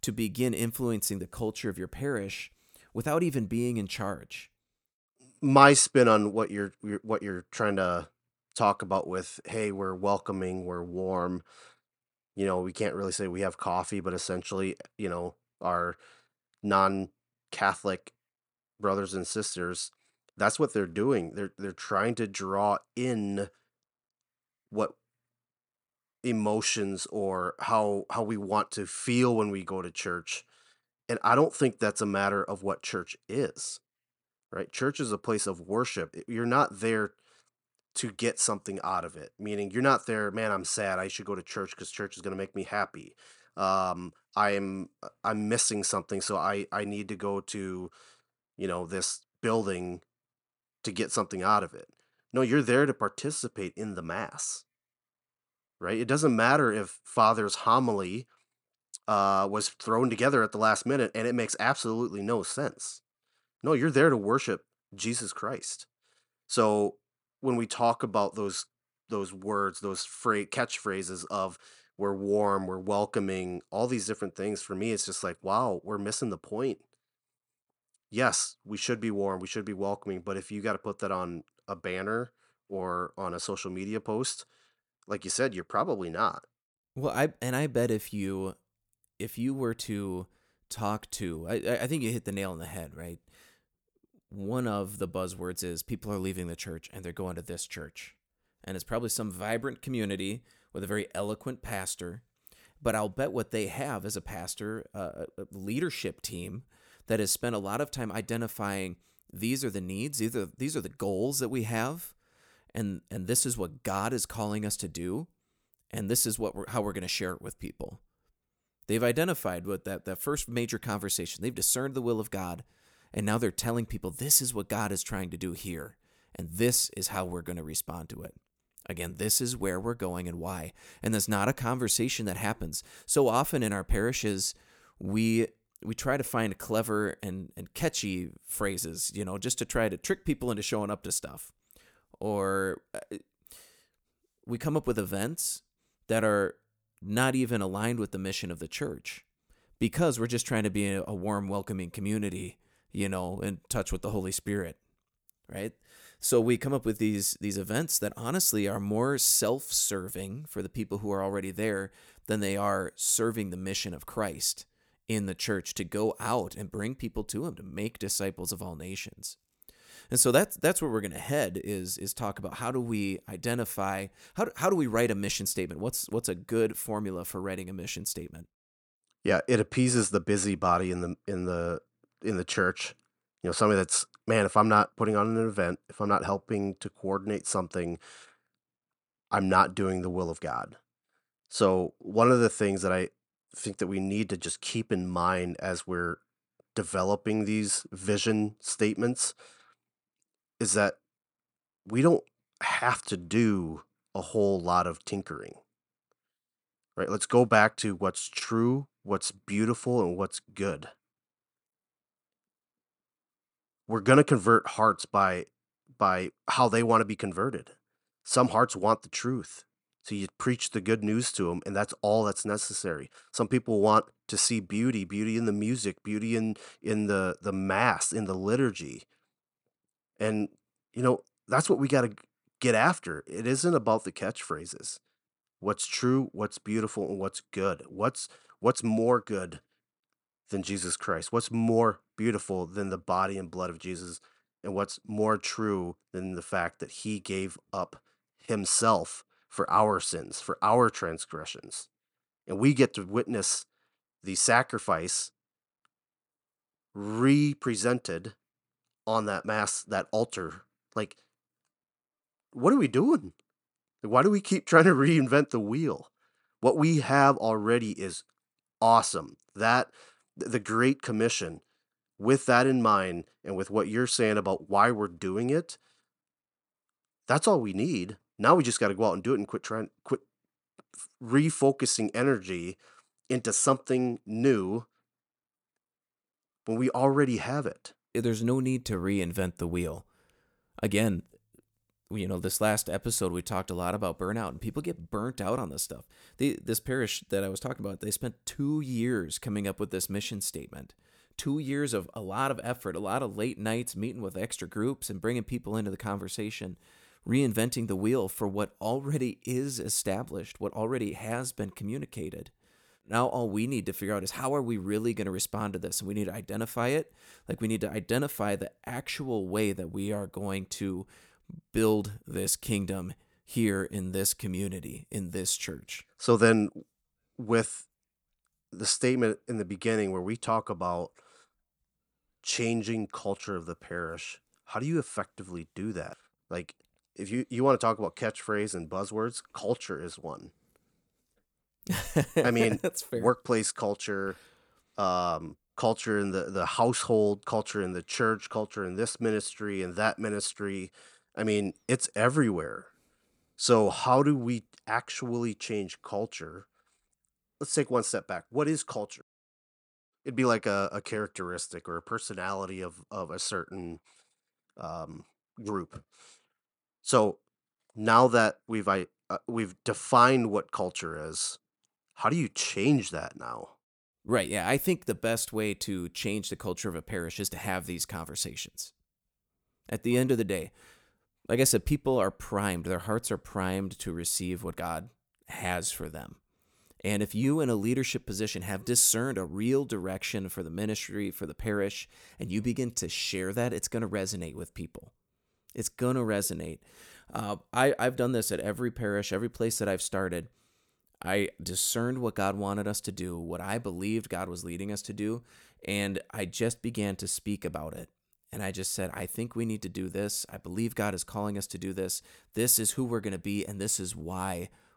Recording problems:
none

